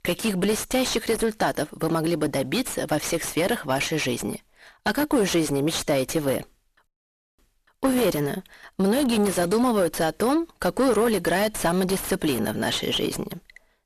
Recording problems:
distortion; heavy; 6 dB below the speech

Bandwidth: 14 kHz